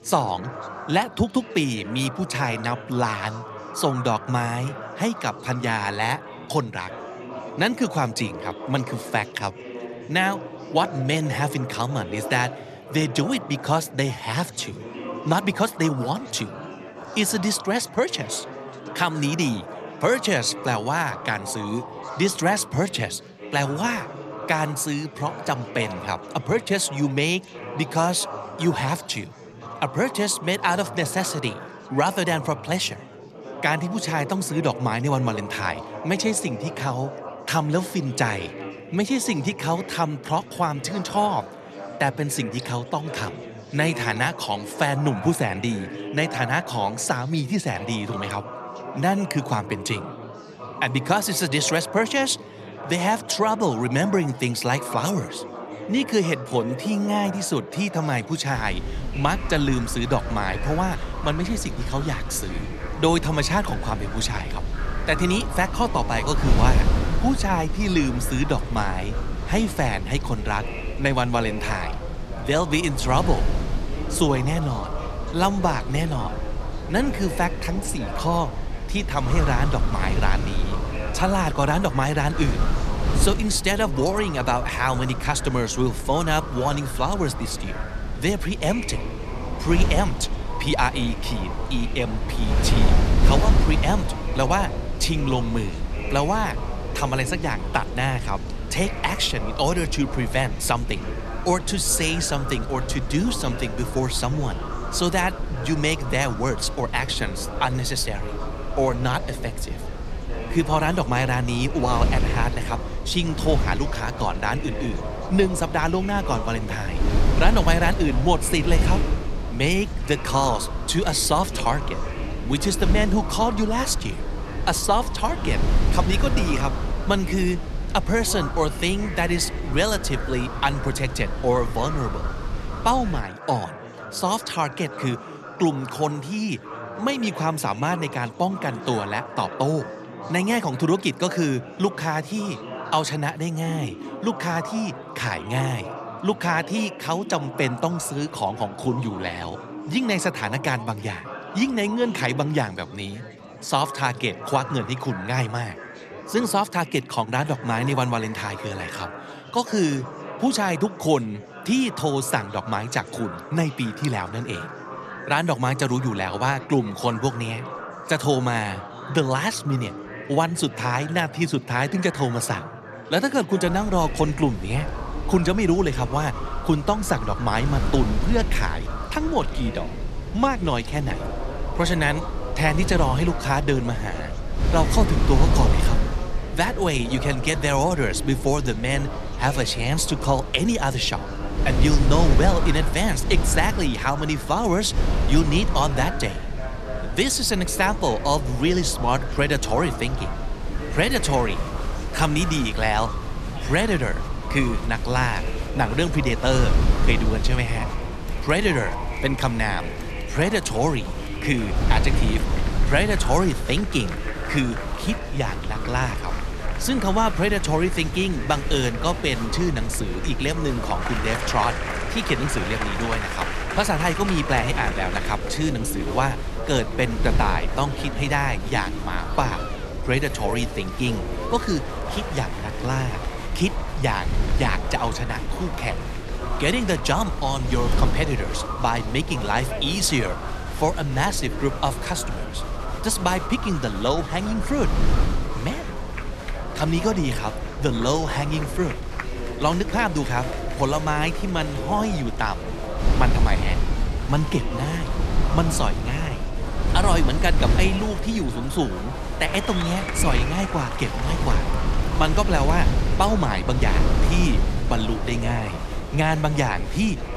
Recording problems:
murmuring crowd; noticeable; throughout; 10 dB below the speech
wind noise on the microphone; occasional gusts; from 59 s to 2:13 and from 2:54 on; 10 dB below the speech

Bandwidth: 13.5 kHz